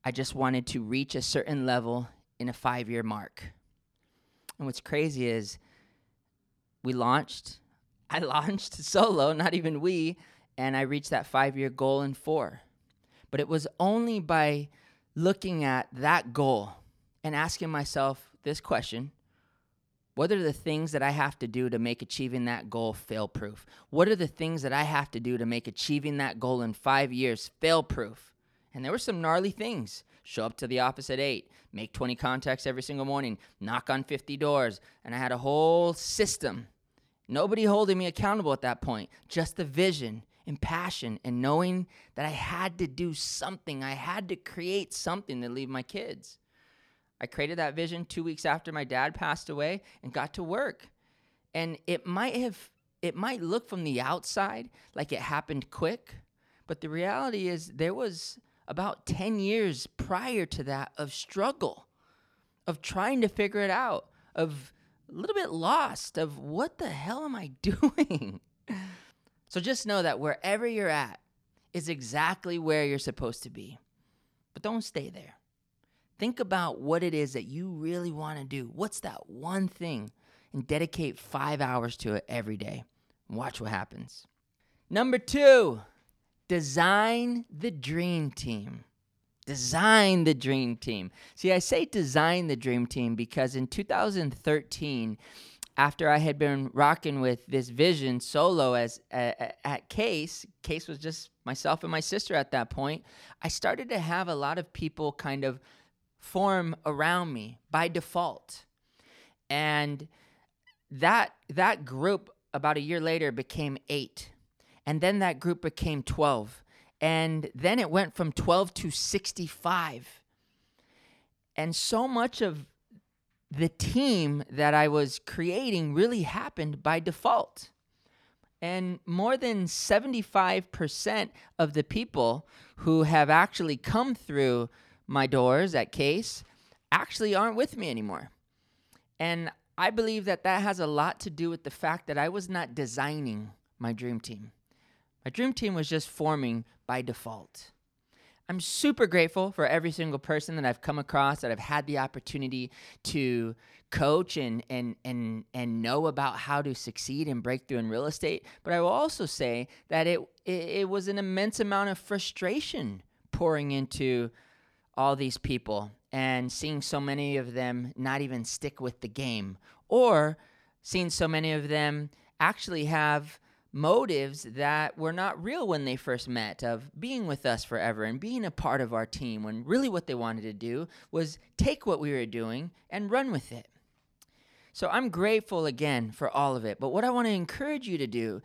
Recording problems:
none

